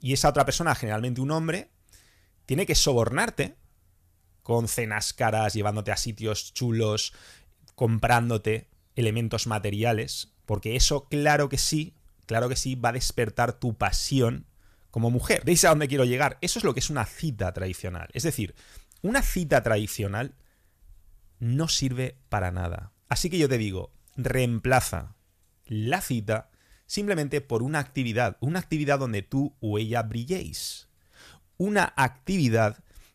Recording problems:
none

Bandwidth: 14.5 kHz